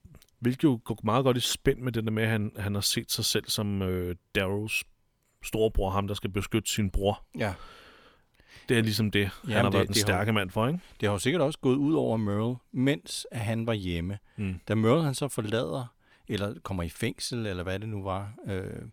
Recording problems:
none

